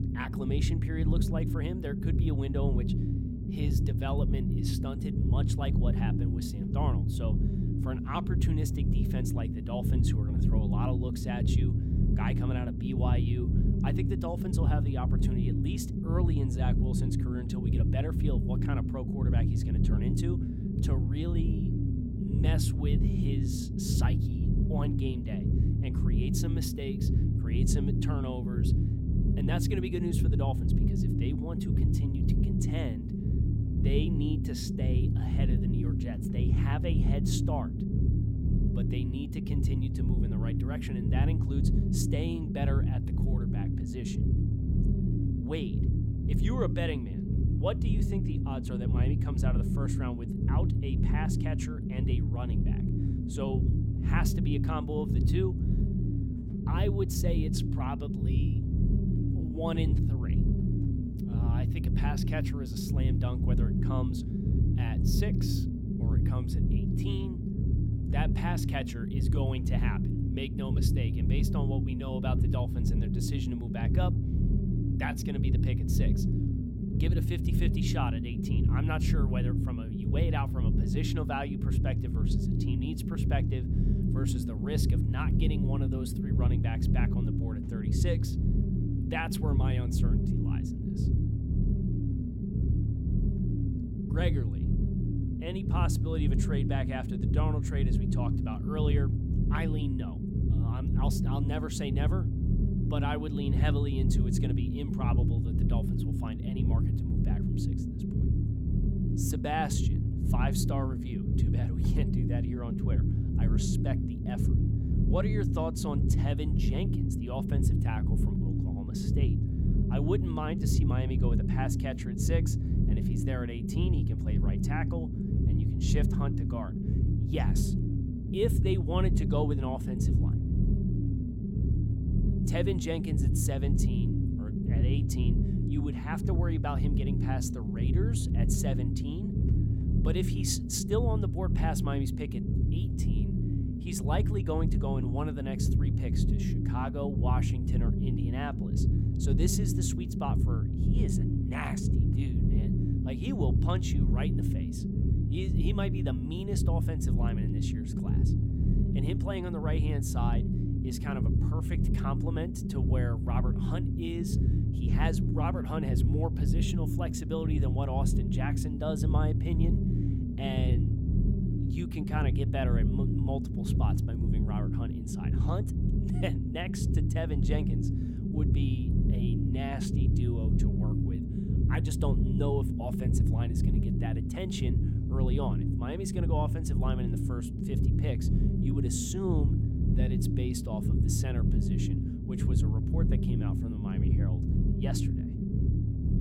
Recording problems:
low rumble; loud; throughout; 1 dB below the speech

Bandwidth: 16.5 kHz